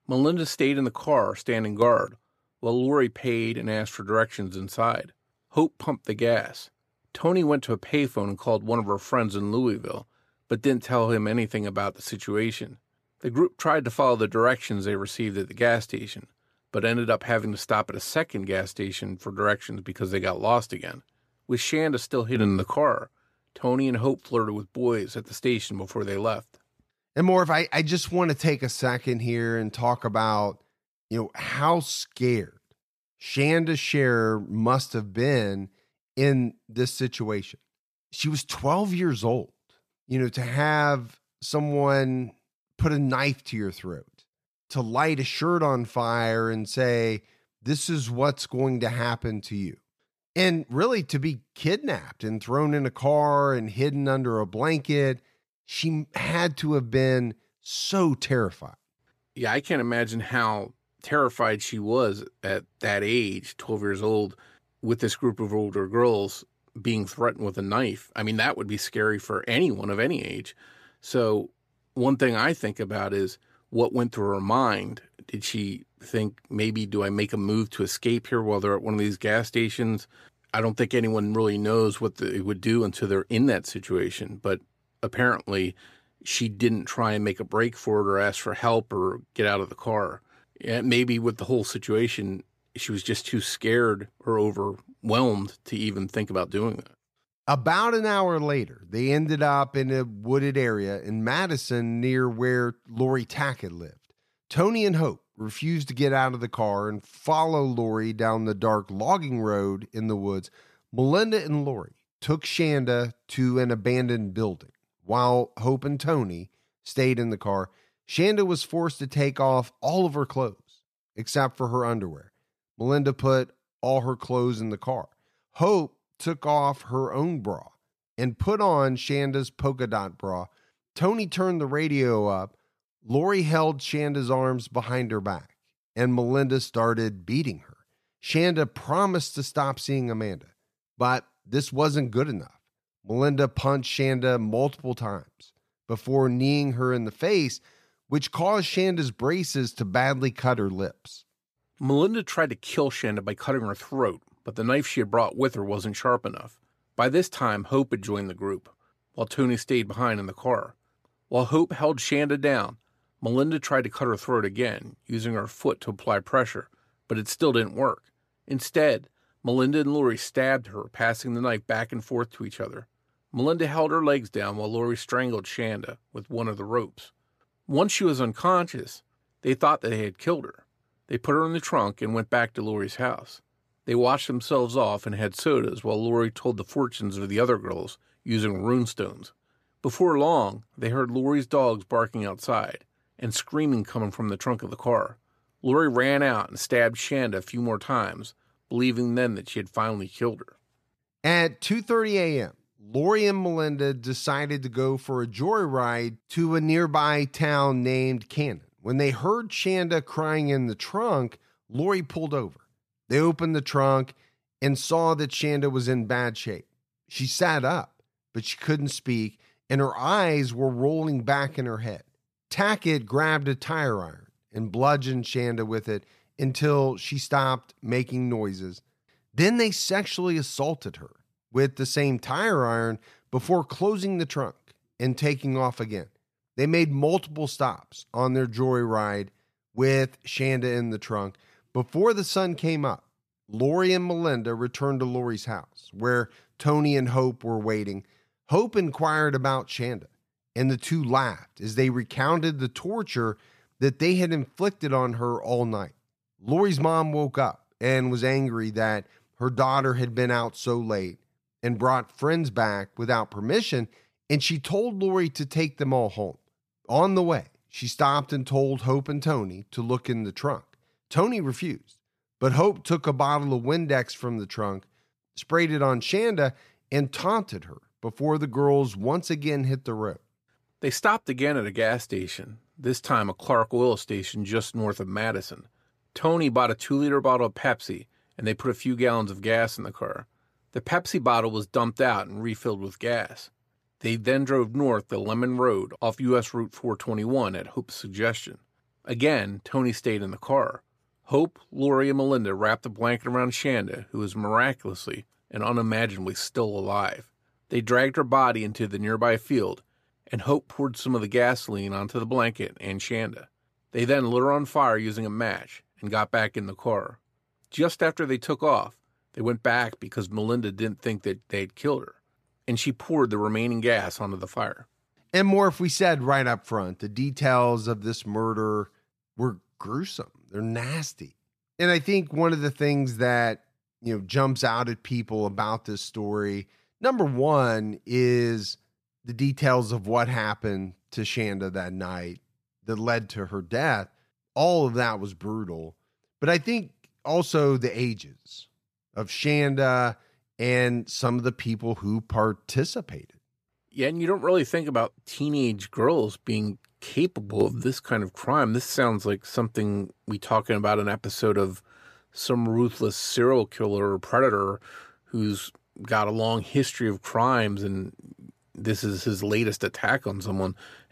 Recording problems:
none

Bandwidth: 14.5 kHz